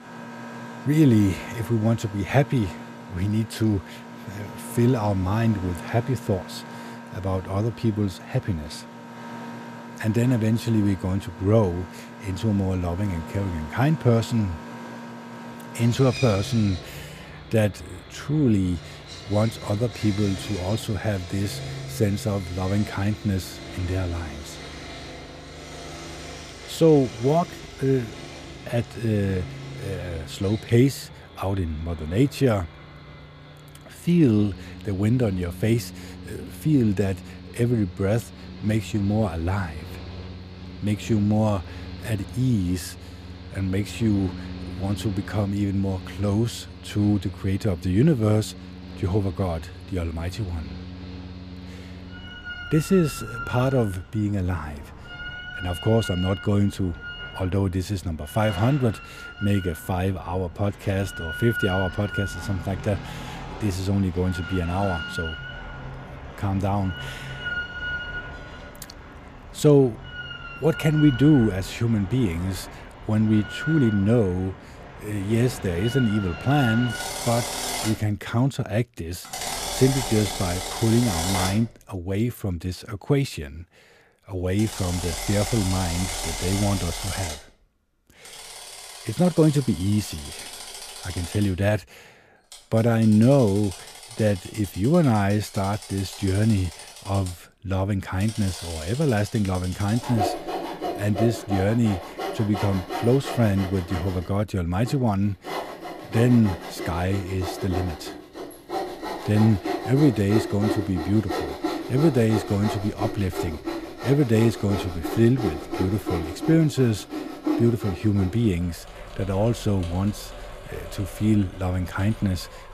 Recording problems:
machinery noise; noticeable; throughout; 10 dB below the speech

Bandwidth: 14.5 kHz